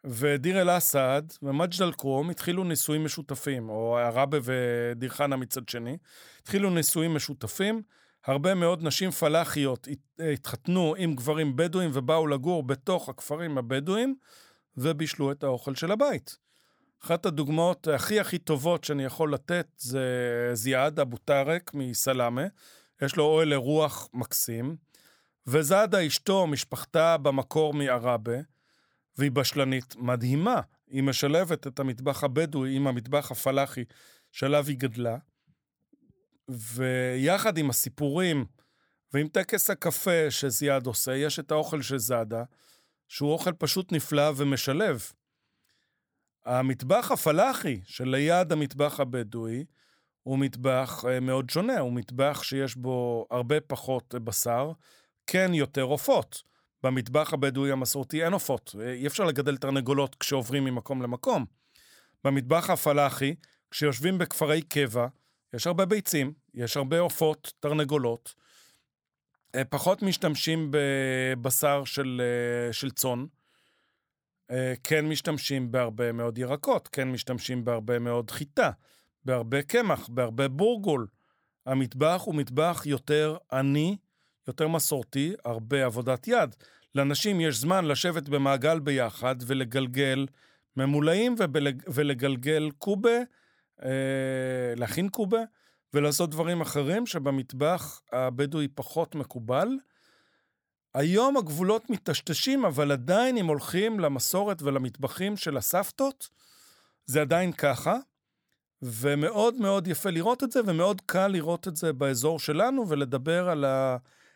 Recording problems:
none

